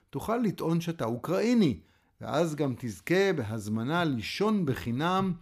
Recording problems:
none

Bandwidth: 15 kHz